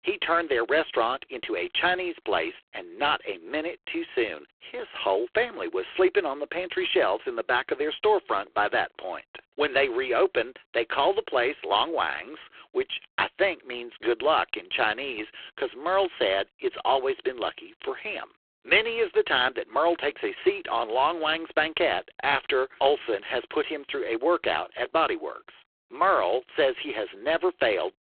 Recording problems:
phone-call audio; poor line

